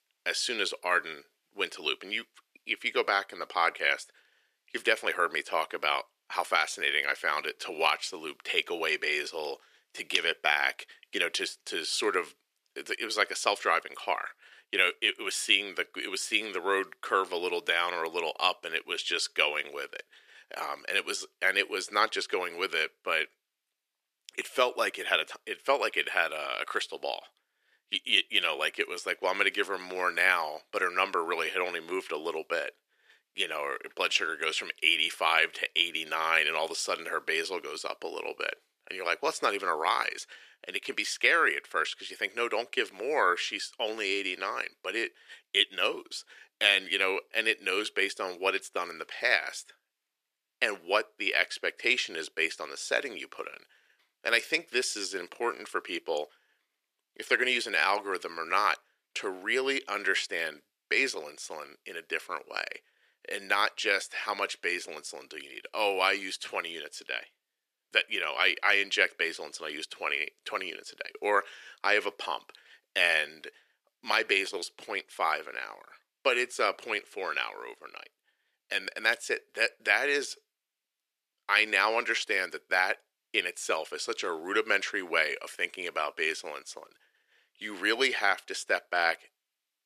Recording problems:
thin; very; fading below 350 Hz

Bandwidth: 14.5 kHz